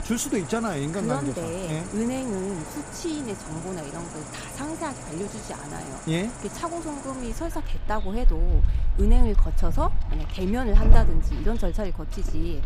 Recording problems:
animal sounds; very loud; throughout; as loud as the speech

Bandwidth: 15 kHz